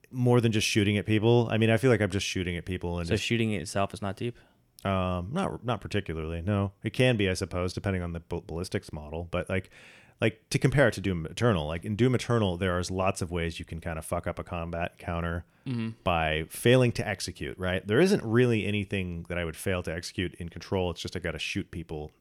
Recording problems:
none

